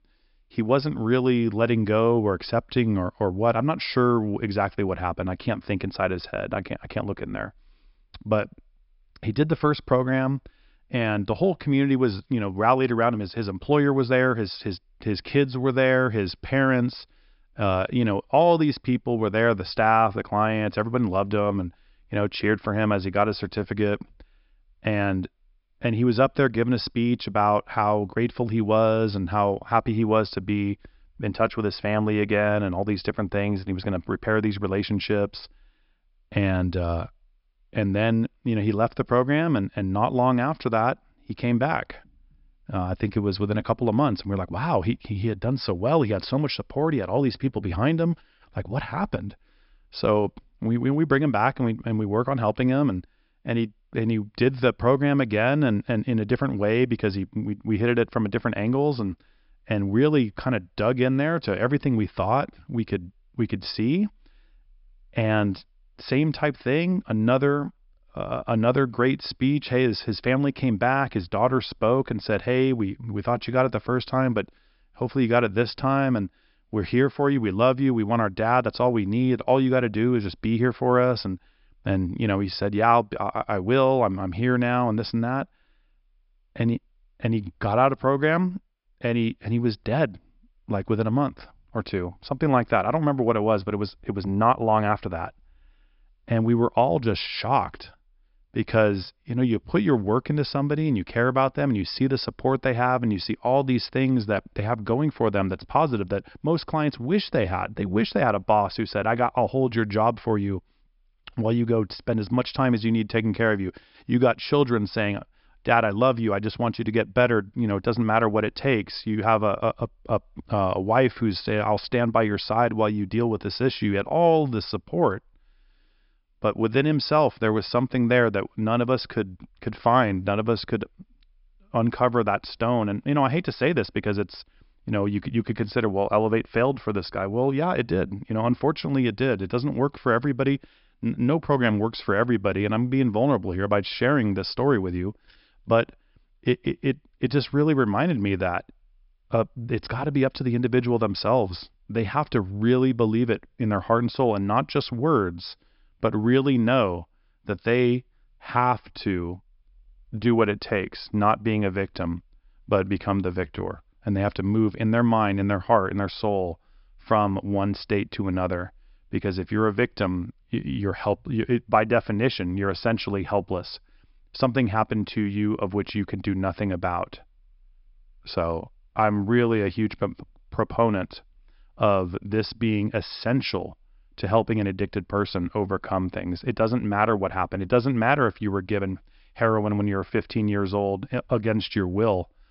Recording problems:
high frequencies cut off; noticeable; nothing above 5.5 kHz

